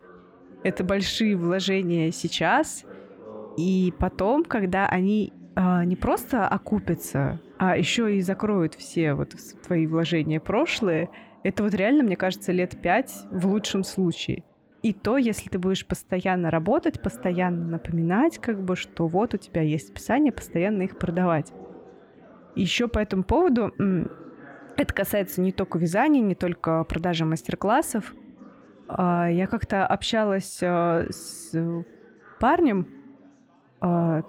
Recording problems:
chatter from many people; faint; throughout; 20 dB below the speech

